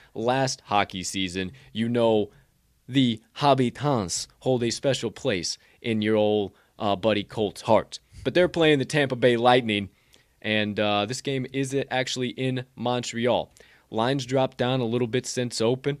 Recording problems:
none

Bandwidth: 14.5 kHz